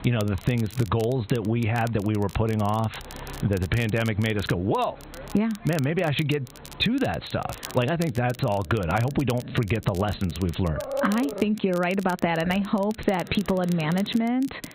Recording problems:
high frequencies cut off; severe; nothing above 4 kHz
squashed, flat; somewhat, background pumping
animal sounds; noticeable; throughout; 15 dB below the speech
crackle, like an old record; noticeable; 20 dB below the speech

